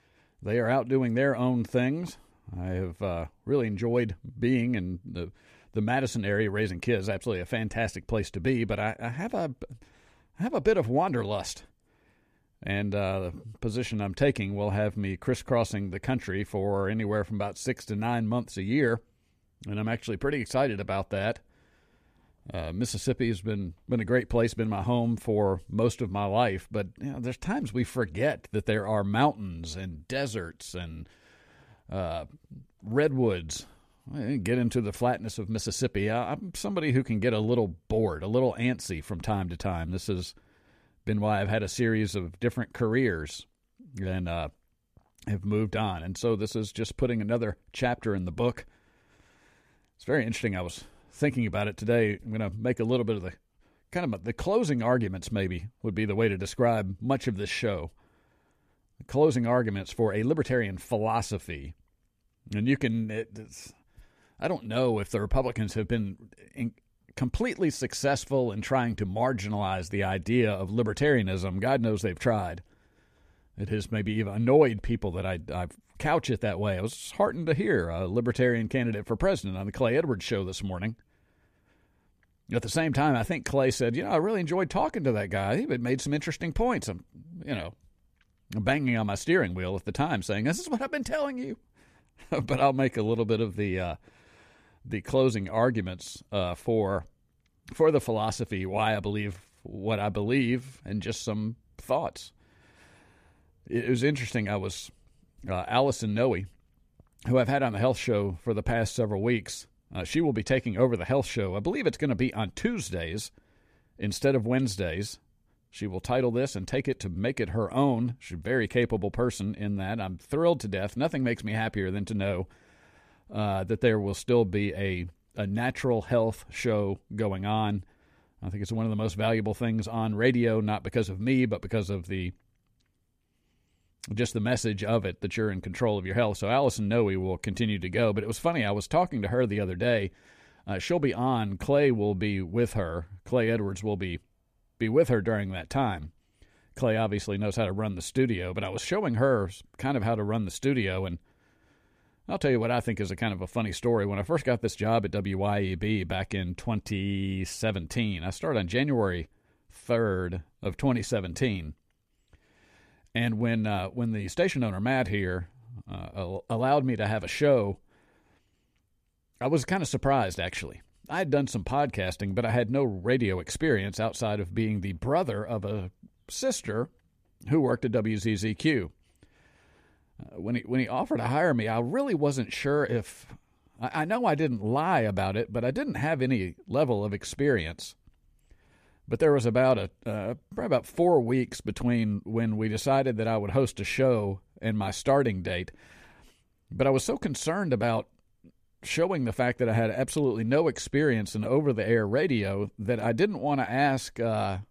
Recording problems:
none

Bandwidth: 14.5 kHz